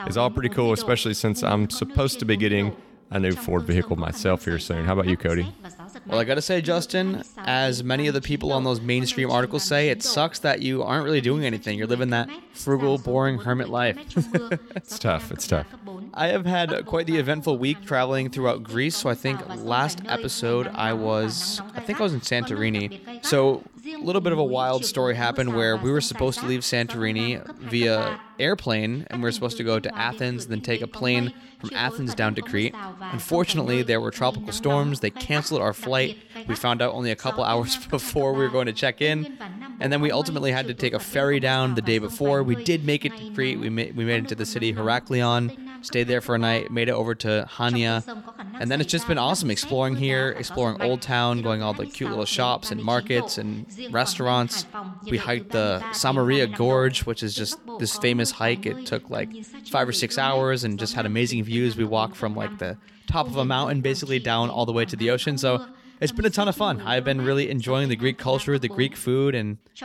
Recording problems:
voice in the background; noticeable; throughout; 15 dB below the speech

